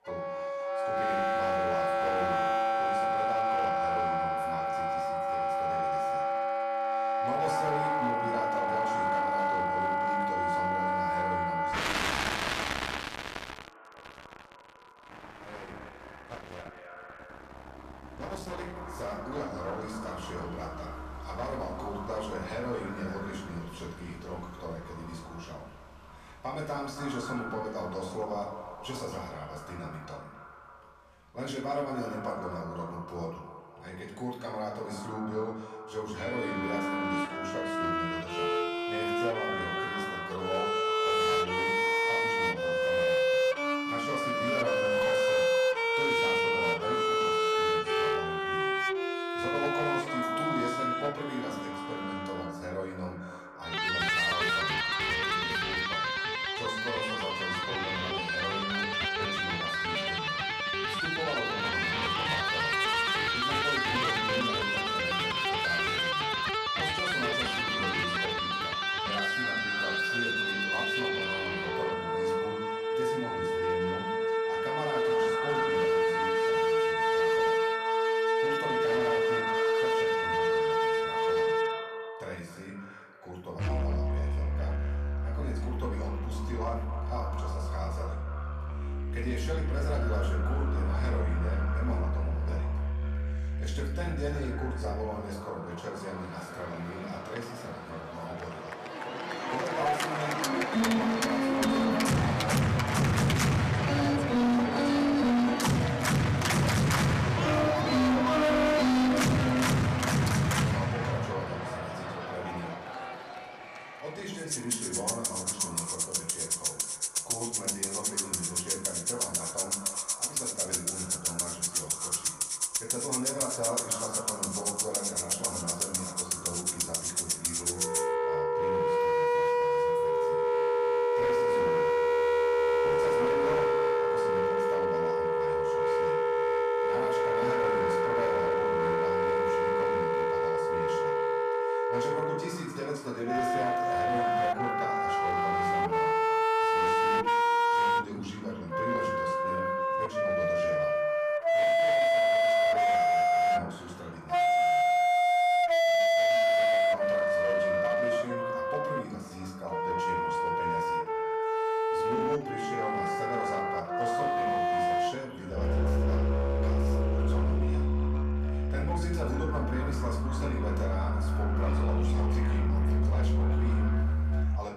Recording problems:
distortion; heavy; 13% of the sound clipped
echo of what is said; strong; throughout; 270 ms later, 8 dB below the speech
off-mic speech; far
room echo; slight; dies away in 0.6 s
background music; very loud; throughout; 10 dB above the speech

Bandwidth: 14.5 kHz